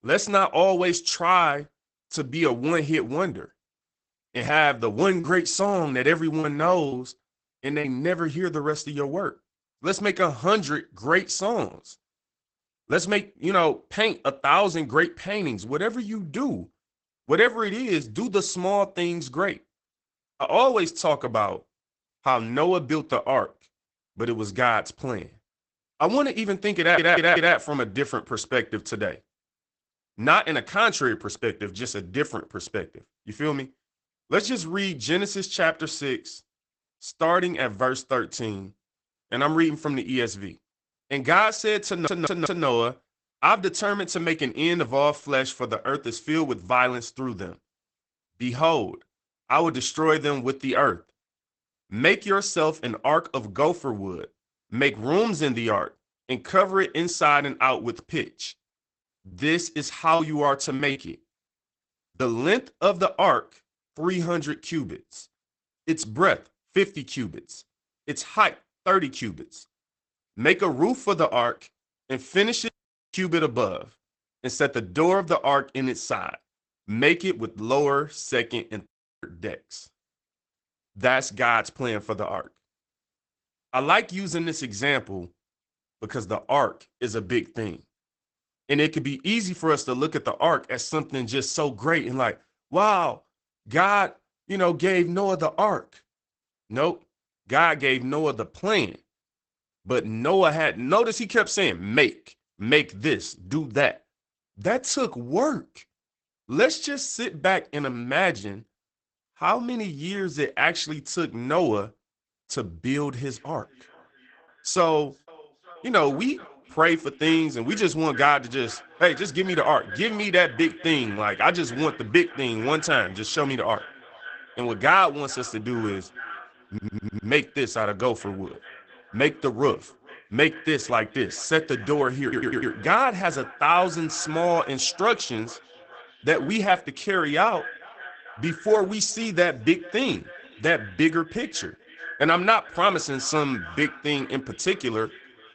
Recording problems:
garbled, watery; badly; nothing above 8 kHz
echo of what is said; faint; from 1:53 on; 430 ms later, 20 dB below the speech
choppy; very; from 5 to 8 s and from 58 s to 1:02; 6% of the speech affected
audio stuttering; 4 times, first at 27 s
audio cutting out; at 1:13 and at 1:19

